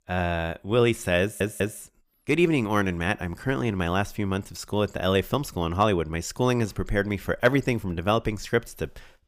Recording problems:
audio stuttering; at 1 s

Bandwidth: 15 kHz